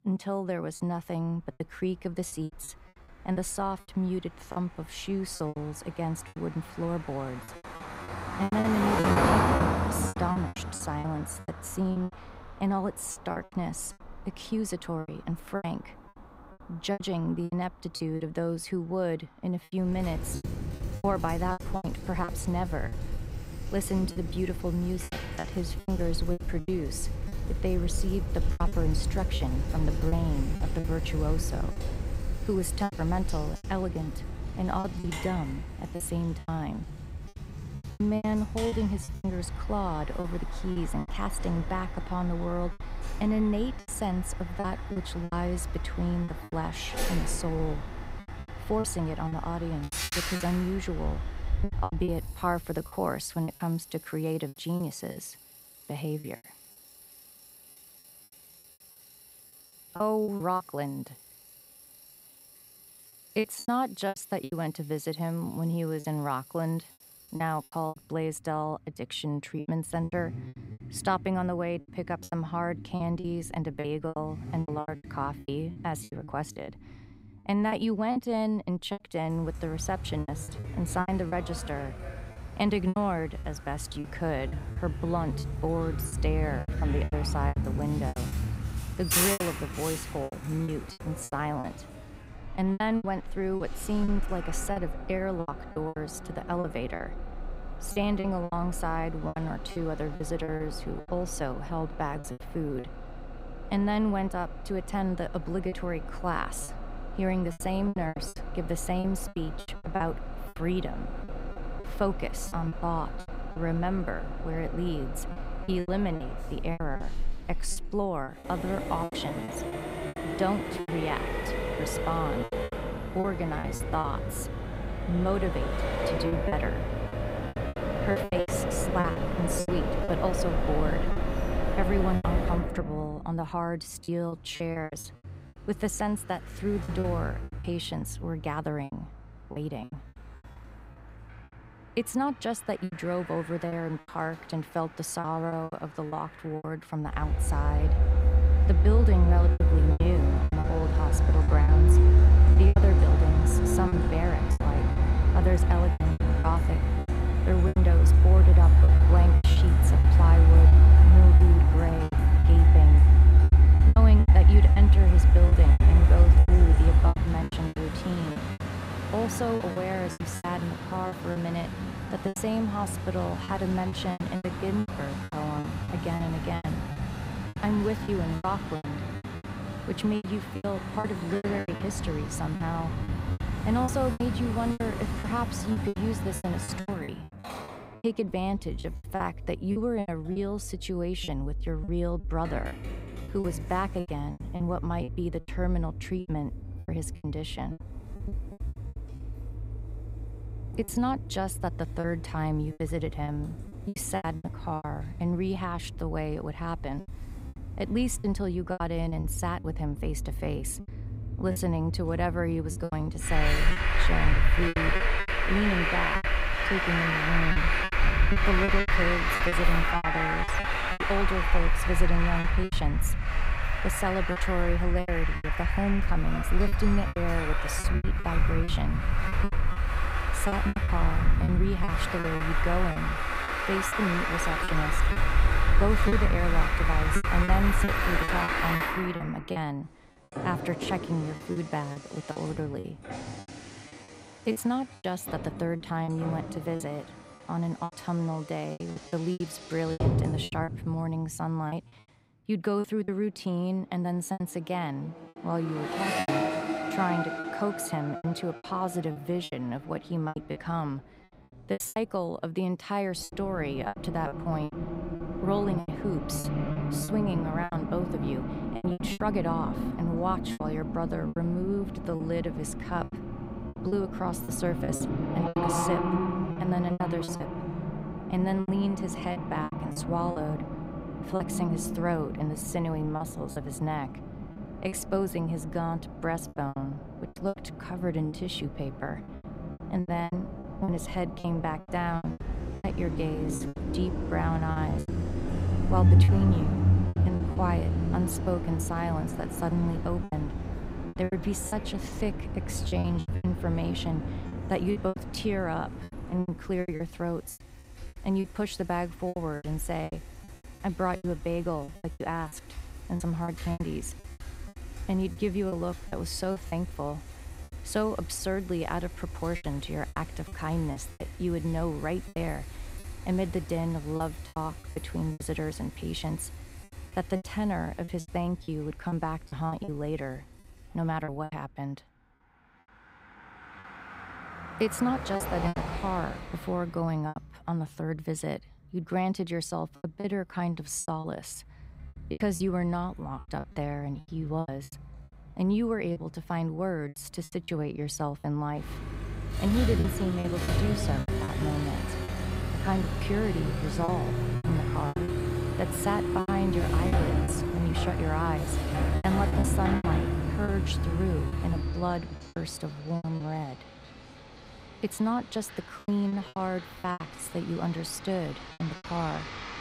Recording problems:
traffic noise; very loud; throughout; 4 dB above the speech
choppy; very; 11% of the speech affected

